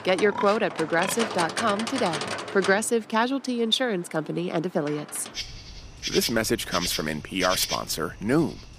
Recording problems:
animal sounds; loud; throughout; 6 dB below the speech

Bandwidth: 15 kHz